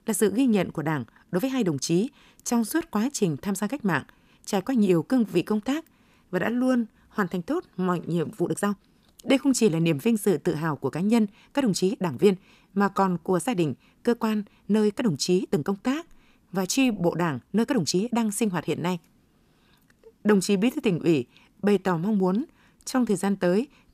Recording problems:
uneven, jittery; strongly; from 1 to 23 s

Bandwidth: 14.5 kHz